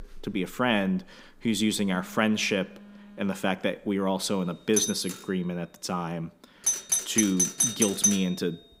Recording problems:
alarms or sirens; very loud; throughout; 2 dB above the speech

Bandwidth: 15.5 kHz